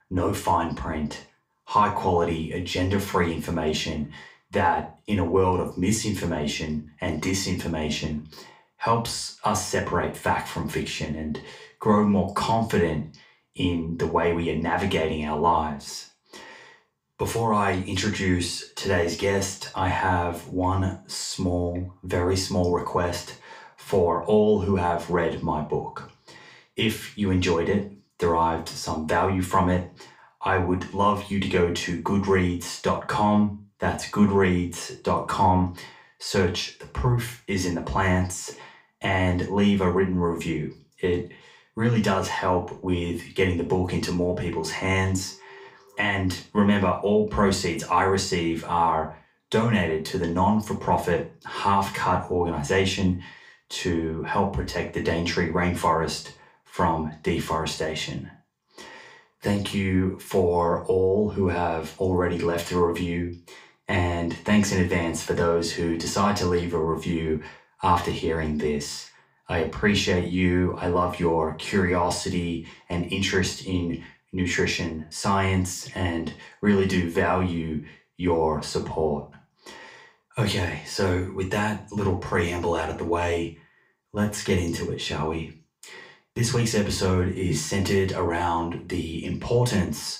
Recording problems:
off-mic speech; far
room echo; slight; dies away in 0.3 s

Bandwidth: 15.5 kHz